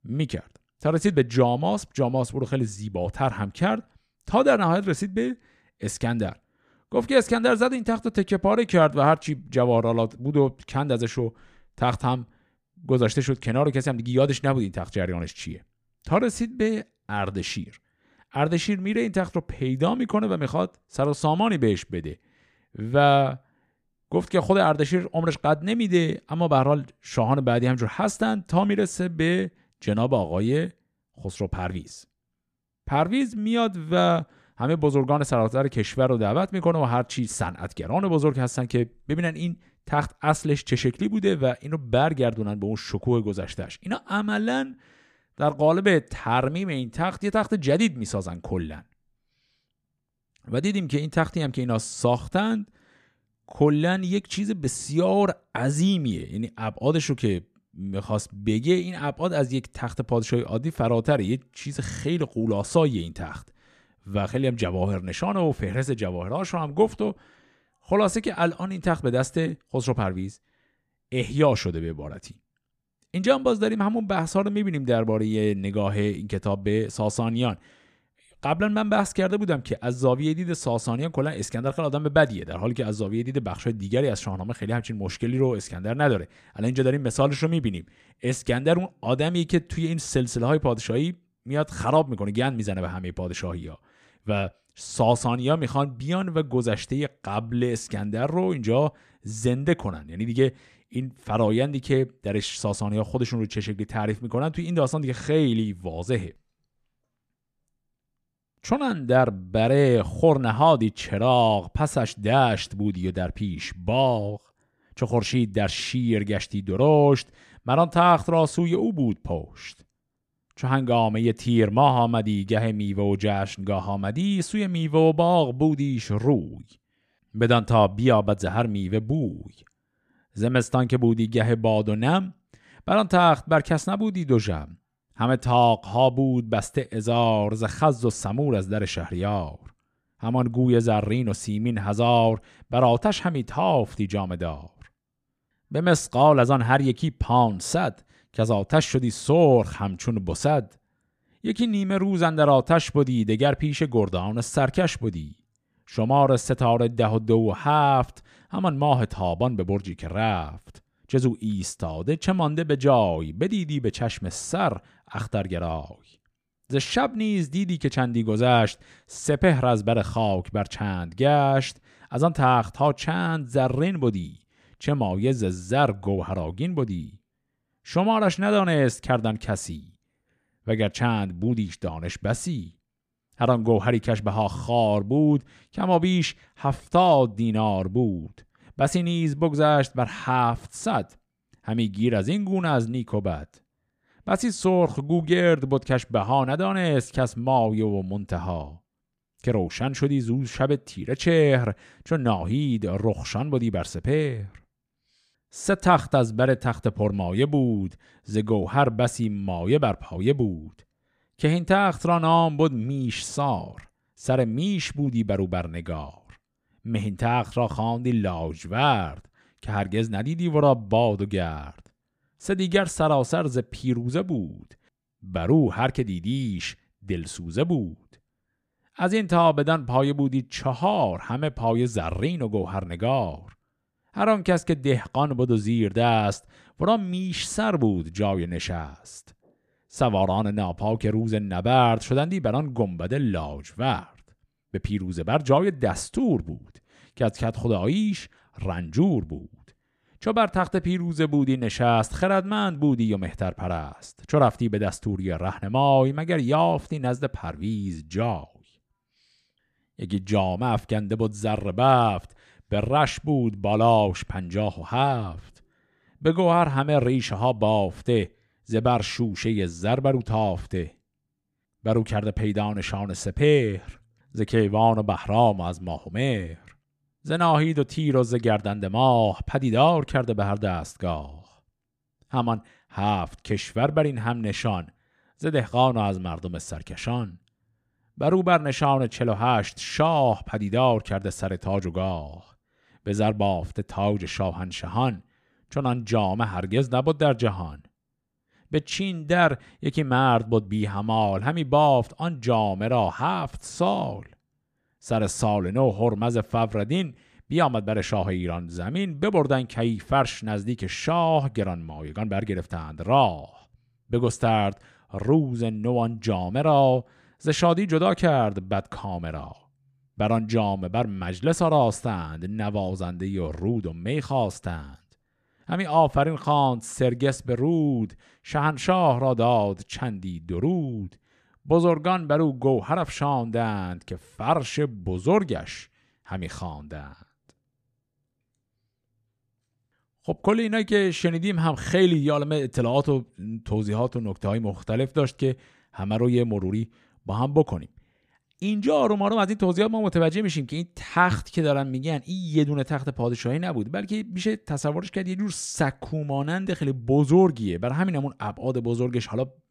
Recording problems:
none

